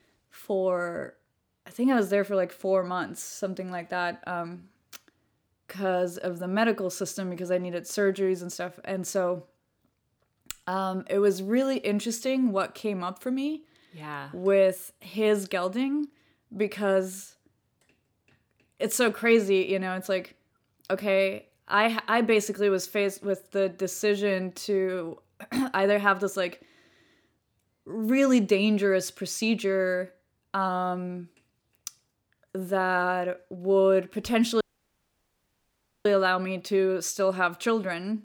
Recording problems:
audio cutting out; at 35 s for 1.5 s

